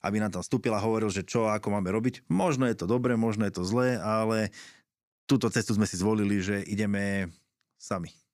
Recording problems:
none

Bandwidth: 15 kHz